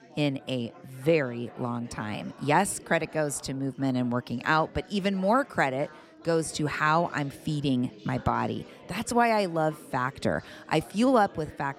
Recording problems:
chatter from many people; faint; throughout; 20 dB below the speech

